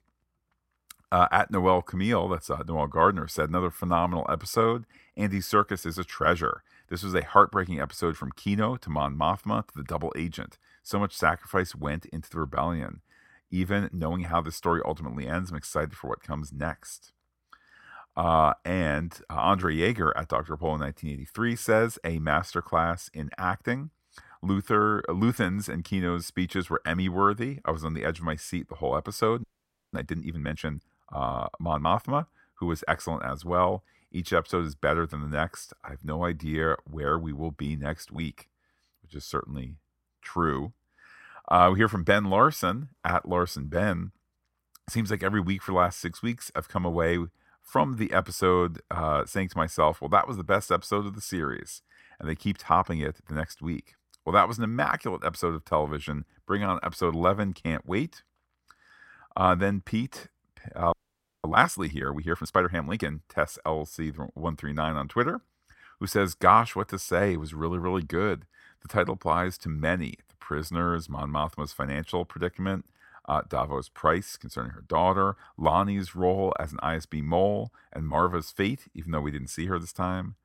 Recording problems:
audio freezing; at 29 s and at 1:01 for 0.5 s

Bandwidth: 16.5 kHz